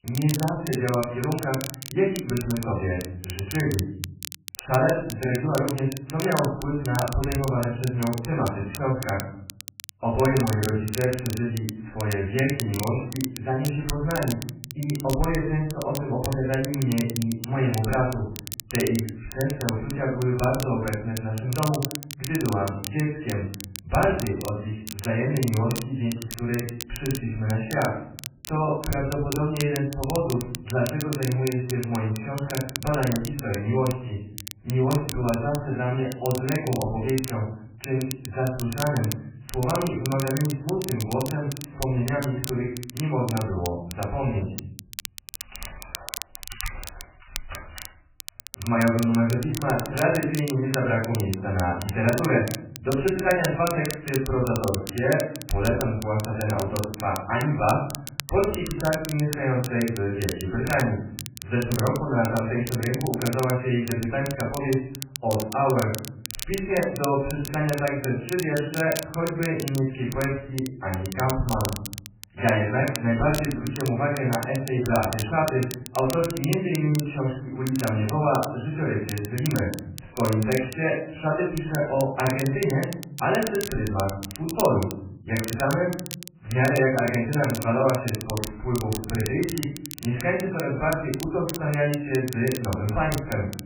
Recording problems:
off-mic speech; far
garbled, watery; badly; nothing above 2.5 kHz
room echo; noticeable; dies away in 0.6 s
crackle, like an old record; noticeable; 10 dB below the speech

